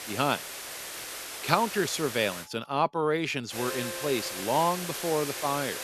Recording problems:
hiss; loud; until 2.5 s and from 3.5 s on; 7 dB below the speech
alarms or sirens; noticeable; throughout; 15 dB below the speech

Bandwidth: 13.5 kHz